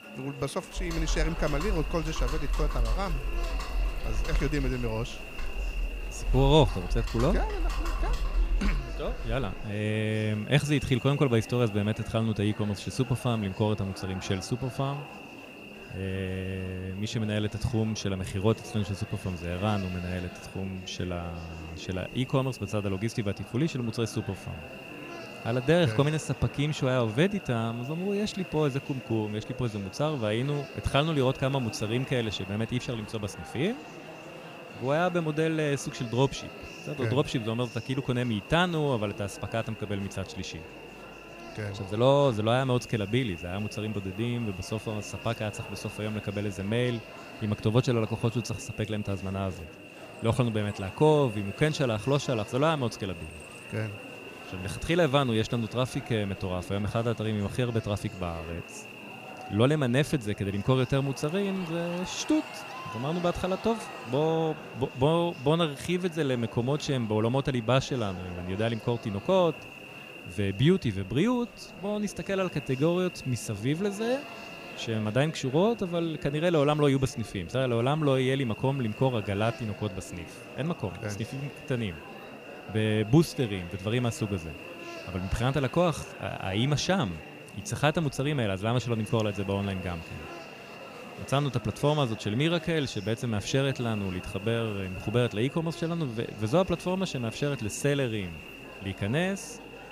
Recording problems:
electrical hum; noticeable; throughout; 60 Hz, 15 dB below the speech
murmuring crowd; noticeable; throughout; 15 dB below the speech
keyboard typing; noticeable; from 1 to 9.5 s; peak 2 dB below the speech

